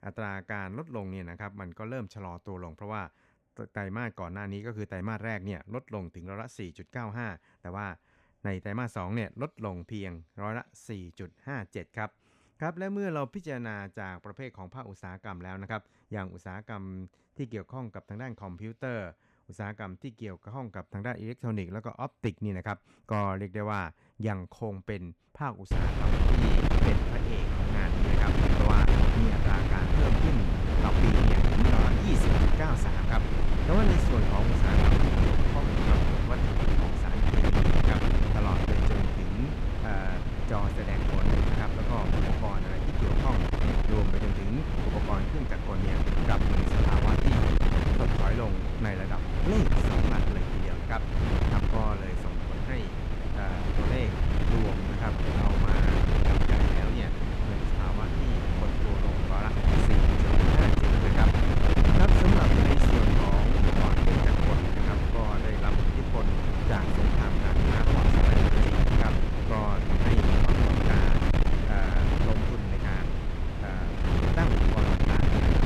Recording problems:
wind noise on the microphone; heavy; from 26 s on; 4 dB above the speech

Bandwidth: 14.5 kHz